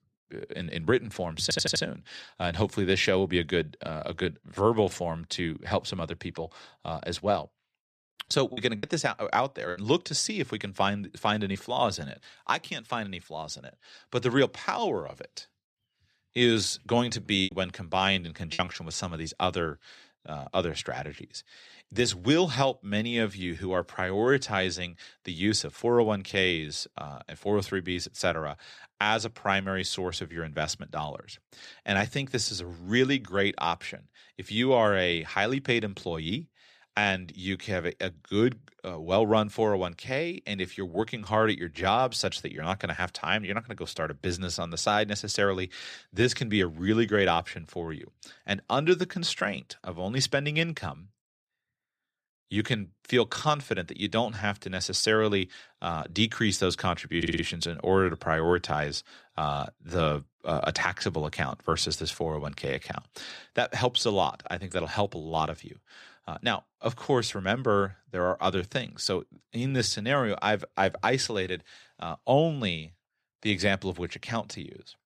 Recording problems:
audio stuttering; at 1.5 s and at 57 s
choppy; very; from 8.5 to 12 s and from 17 to 19 s; 6% of the speech affected

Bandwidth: 14 kHz